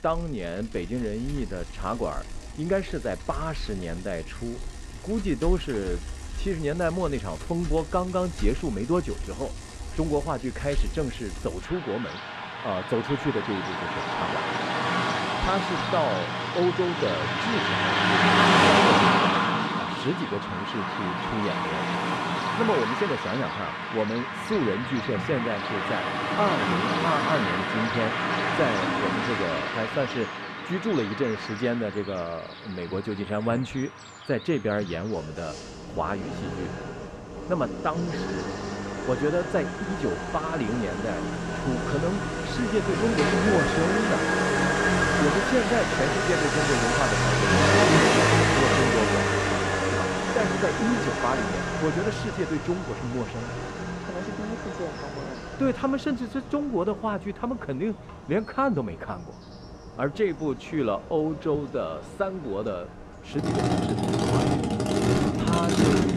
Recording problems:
traffic noise; very loud; throughout; 4 dB above the speech

